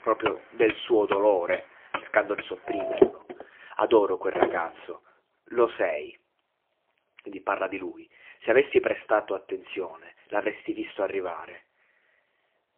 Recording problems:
phone-call audio; poor line; nothing above 3.5 kHz
traffic noise; loud; until 4.5 s; 4 dB below the speech

